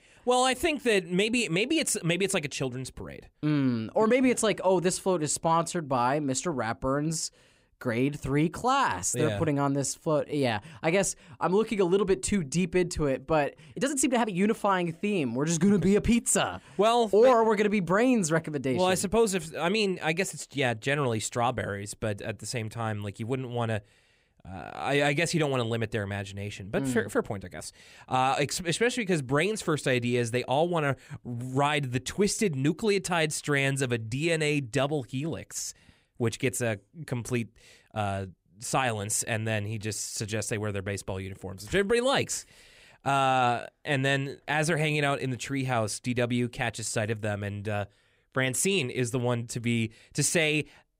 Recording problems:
uneven, jittery; strongly; from 9.5 to 40 s

